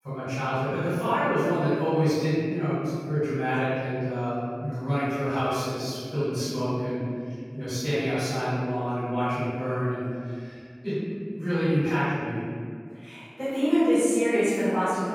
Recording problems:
room echo; strong; dies away in 2.1 s
off-mic speech; far

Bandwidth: 17.5 kHz